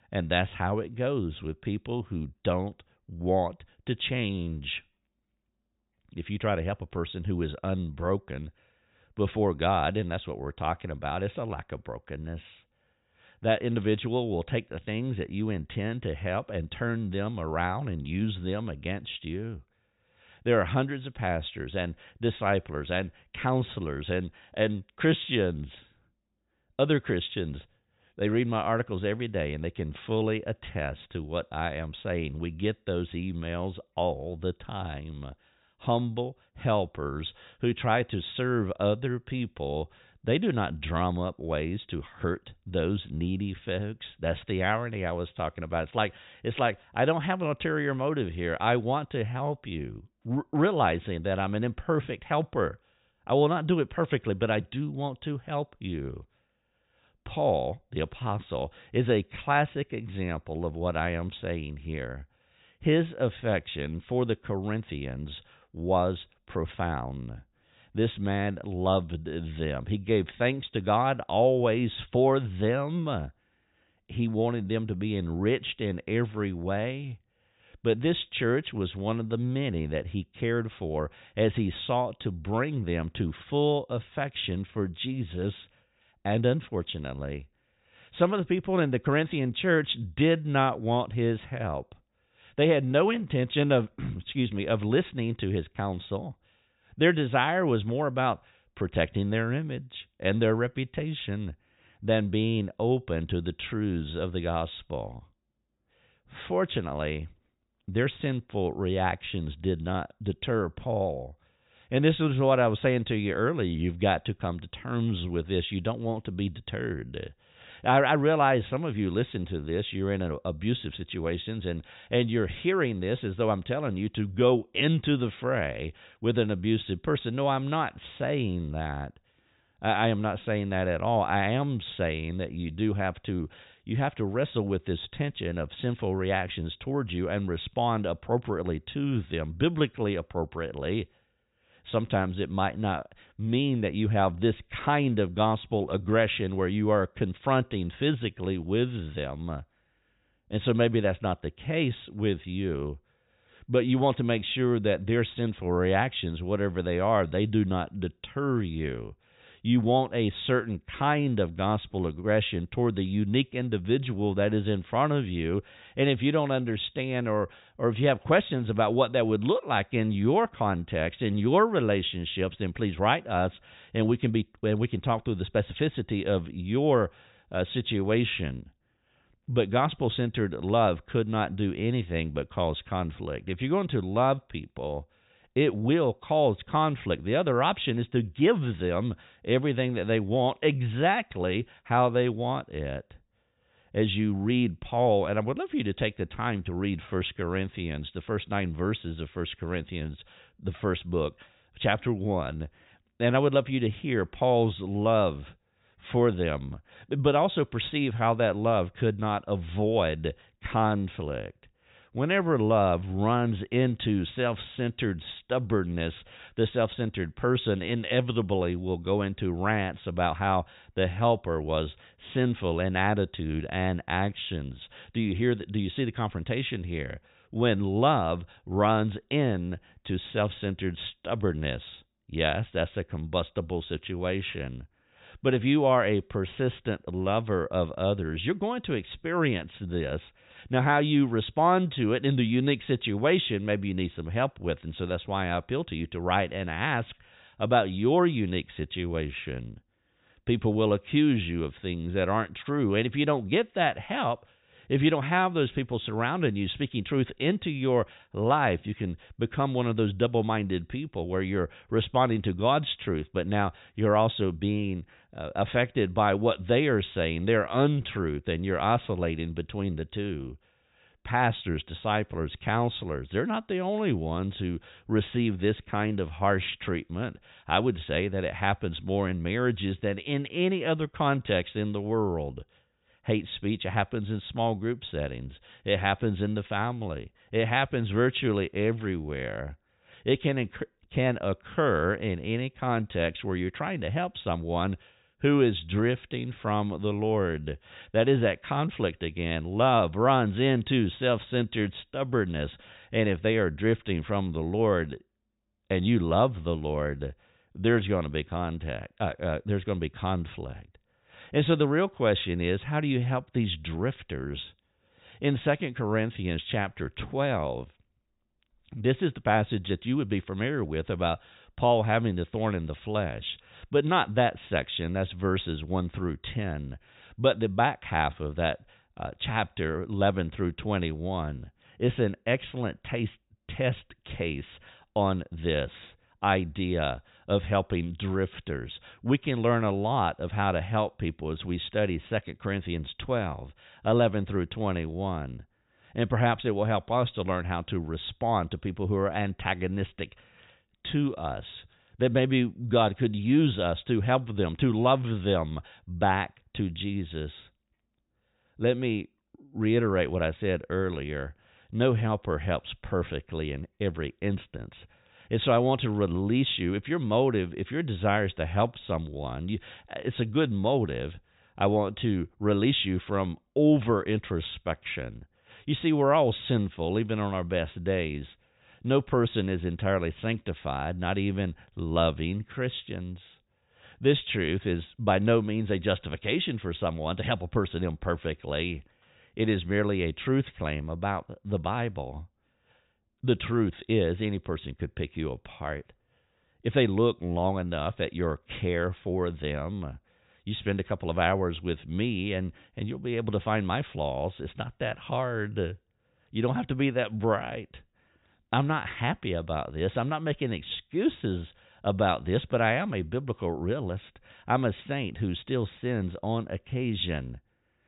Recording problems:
high frequencies cut off; severe; nothing above 4 kHz

